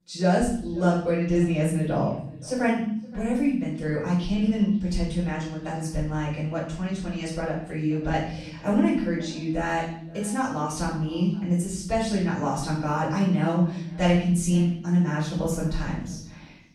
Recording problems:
off-mic speech; far
room echo; noticeable; dies away in 0.8 s
echo of what is said; faint; throughout; 520 ms later, 25 dB below the speech

